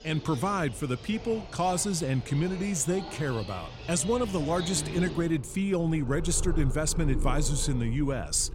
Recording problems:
animal sounds; loud; throughout; 10 dB below the speech

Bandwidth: 16 kHz